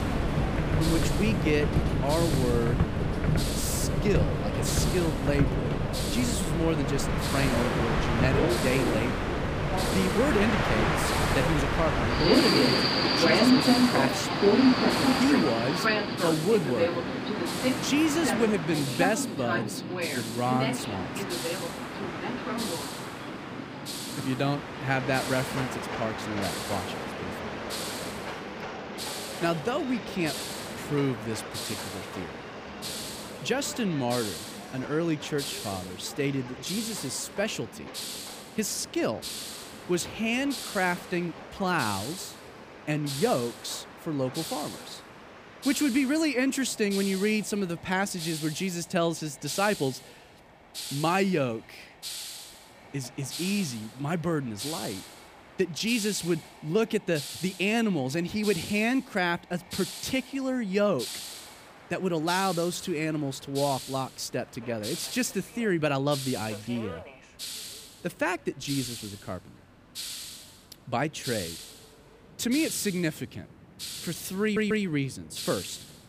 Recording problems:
train or aircraft noise; very loud; throughout; 1 dB above the speech
hiss; loud; throughout; 8 dB below the speech
audio stuttering; at 1:14

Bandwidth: 15 kHz